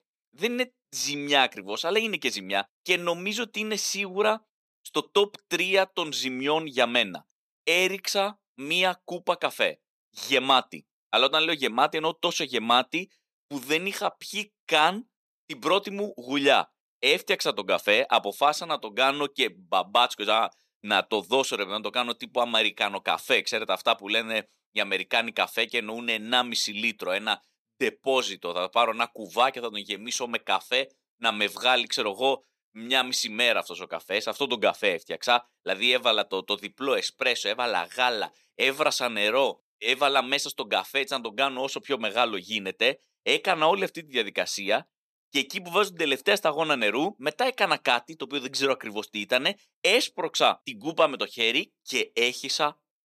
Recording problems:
thin; somewhat; fading below 400 Hz

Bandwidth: 14 kHz